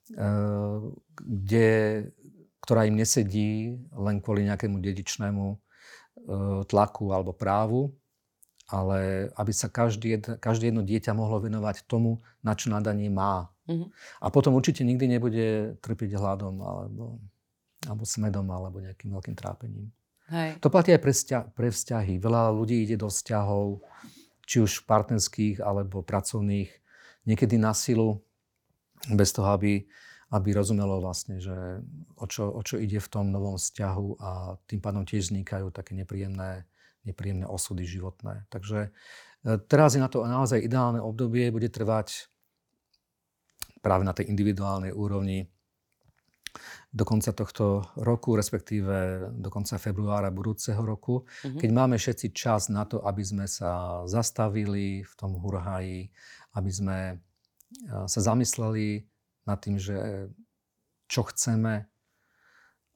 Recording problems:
none

